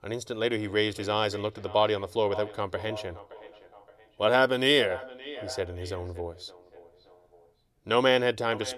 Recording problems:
echo of what is said; noticeable; throughout; 570 ms later, 15 dB below the speech

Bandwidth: 14 kHz